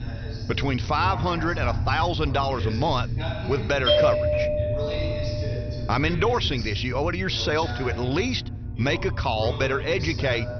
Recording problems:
high frequencies cut off; noticeable; nothing above 6 kHz
voice in the background; noticeable; throughout; 10 dB below the speech
low rumble; noticeable; throughout; 20 dB below the speech
doorbell; loud; from 4 to 5.5 s; peak 6 dB above the speech

